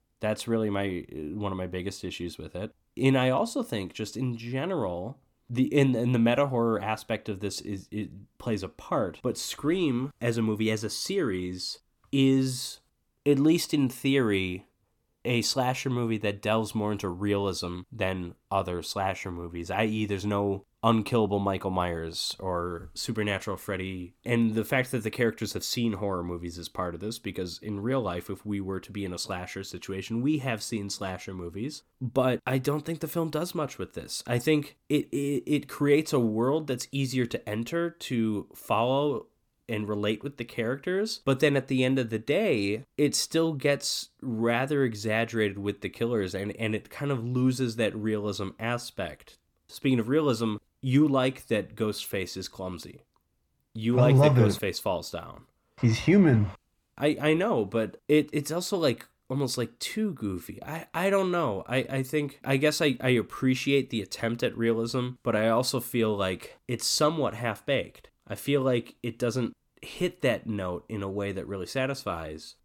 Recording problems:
none

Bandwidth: 17.5 kHz